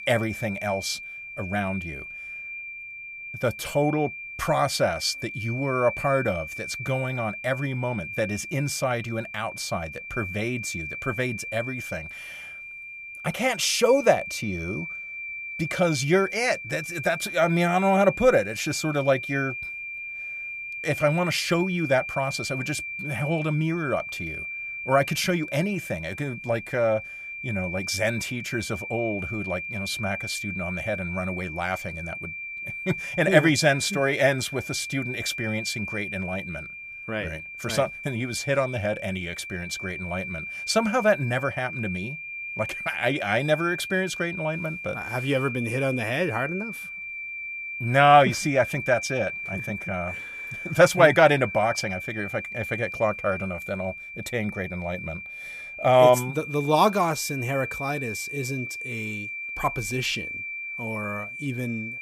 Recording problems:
high-pitched whine; loud; throughout; 2.5 kHz, 8 dB below the speech

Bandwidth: 15 kHz